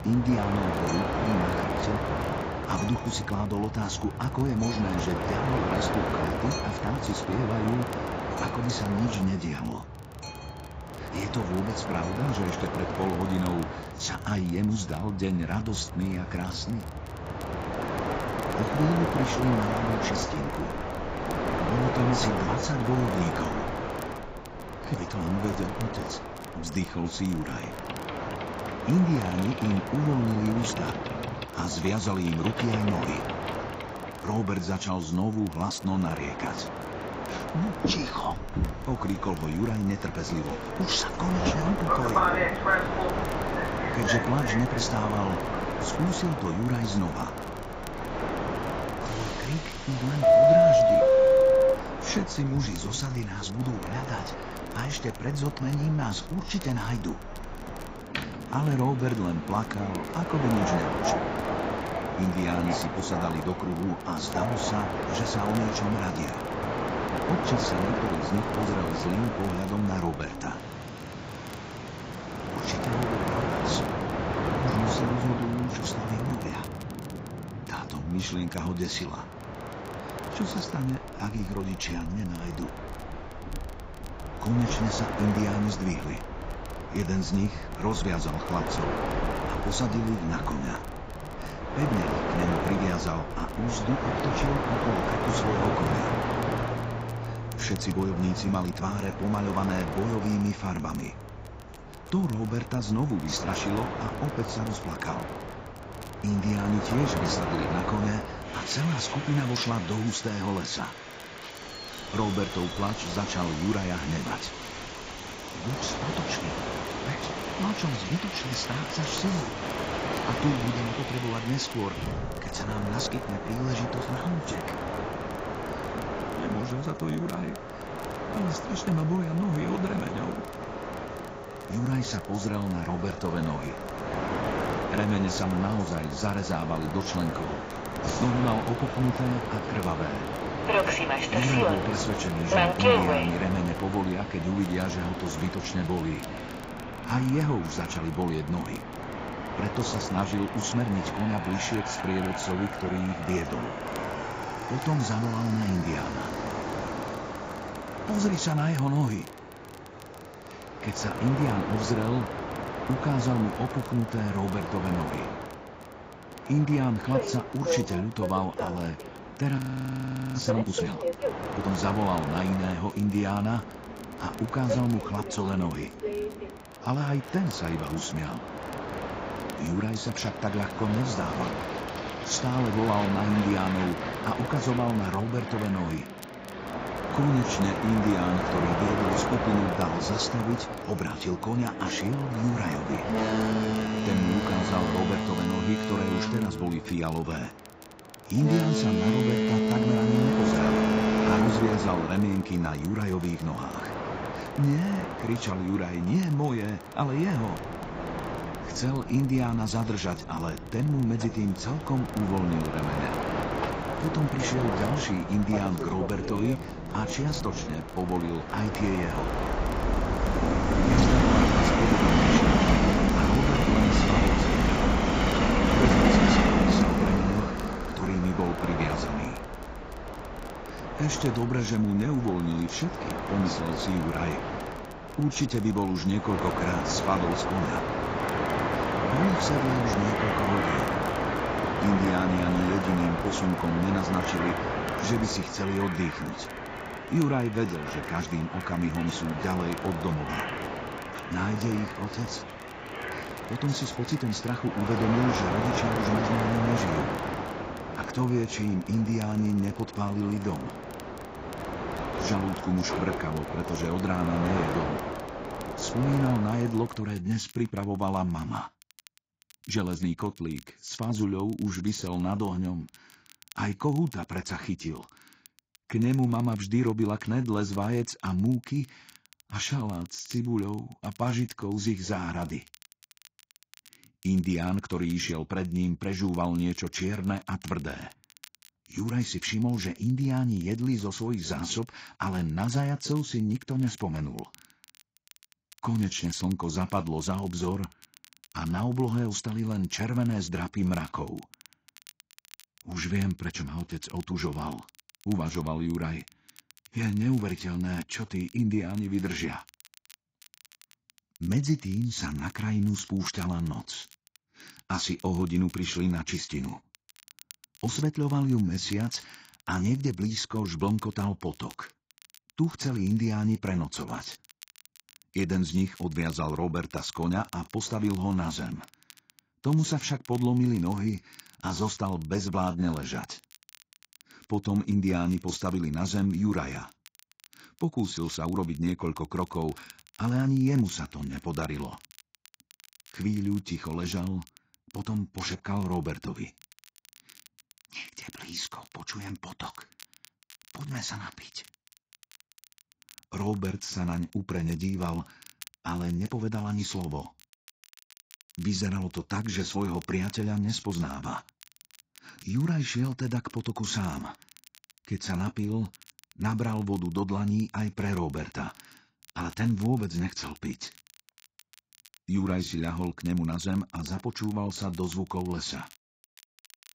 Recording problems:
garbled, watery; badly; nothing above 7.5 kHz
train or aircraft noise; loud; until 4:27; 1 dB below the speech
crackle, like an old record; faint; 25 dB below the speech
audio freezing; at 2:50 for 1 s

